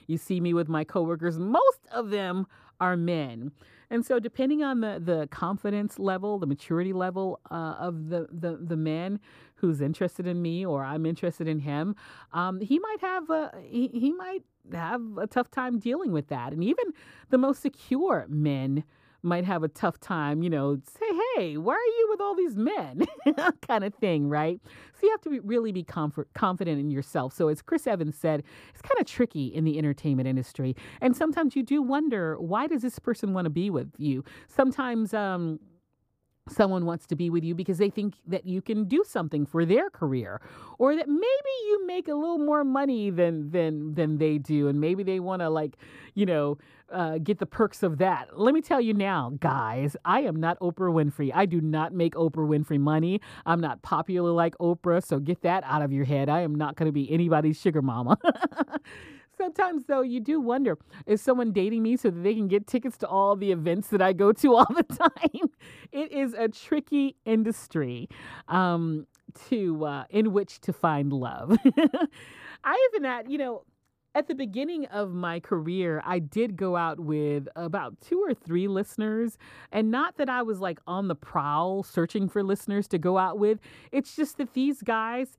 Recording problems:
muffled; slightly; fading above 1 kHz

